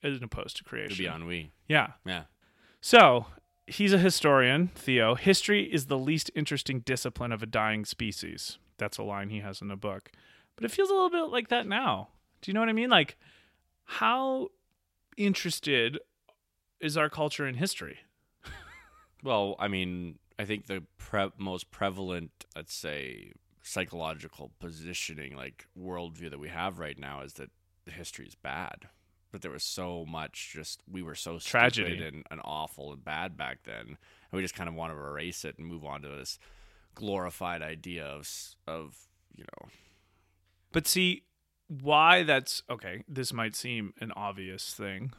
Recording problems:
none

